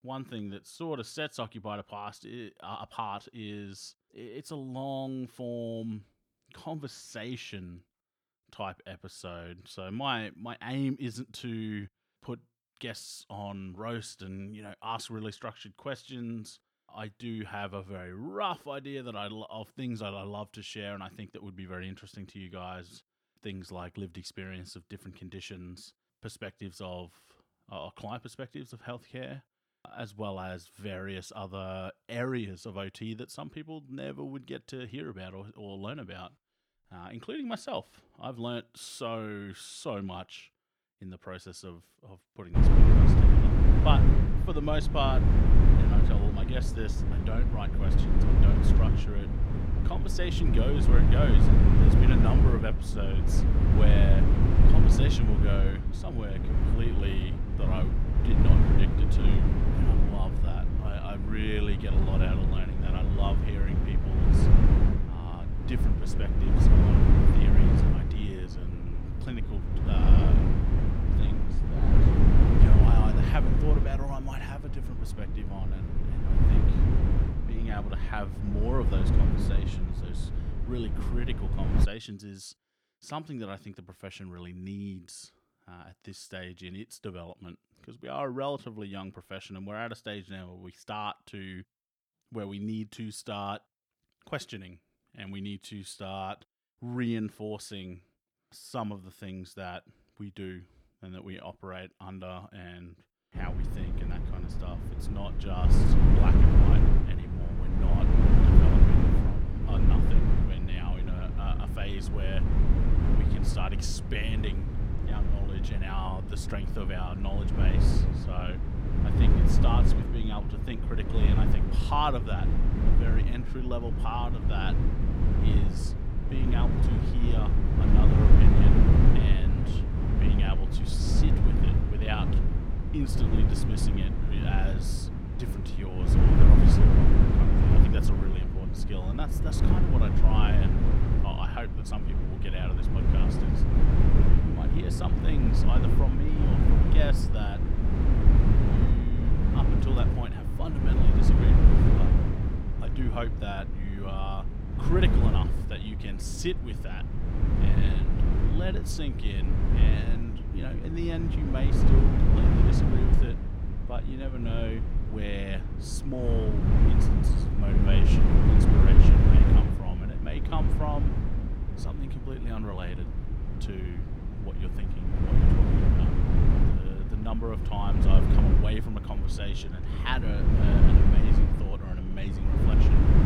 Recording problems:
wind noise on the microphone; heavy; from 43 s to 1:22 and from 1:43 on; 1 dB above the speech

